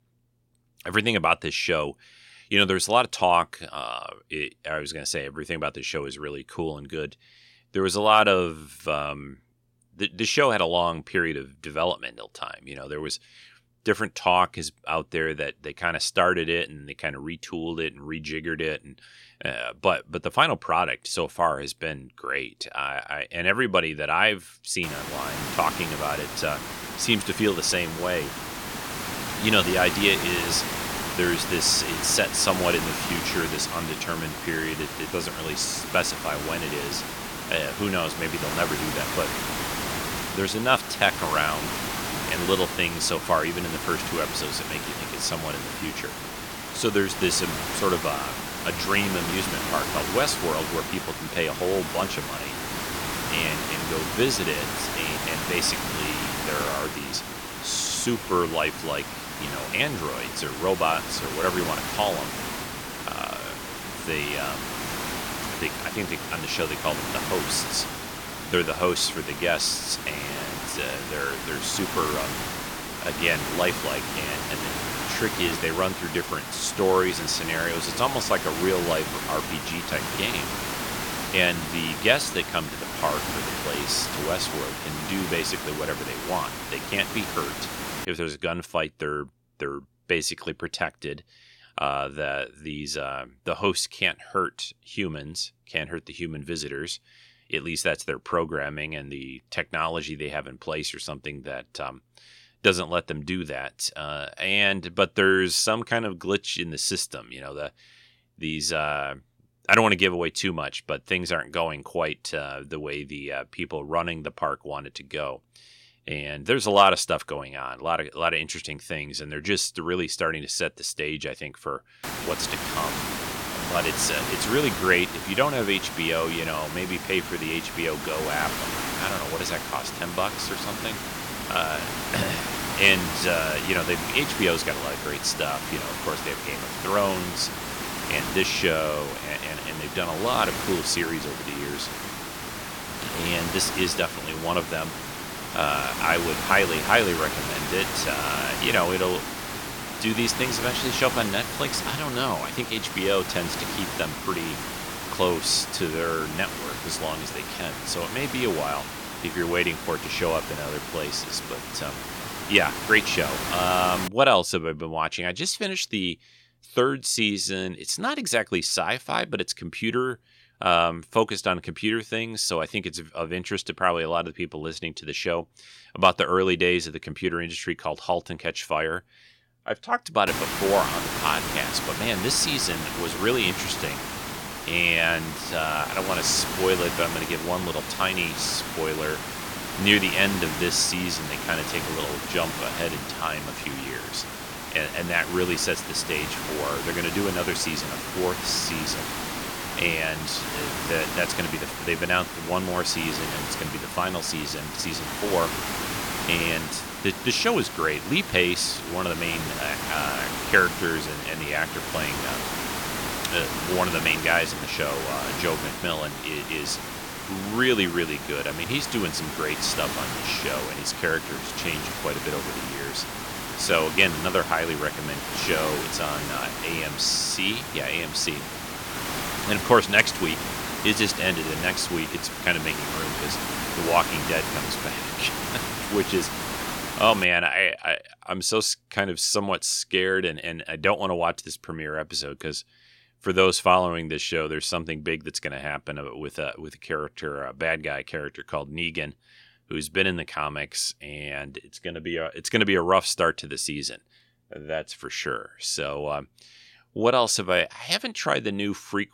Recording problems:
hiss; loud; from 25 s to 1:28, from 2:02 to 2:44 and from 3:00 to 3:57; 5 dB below the speech

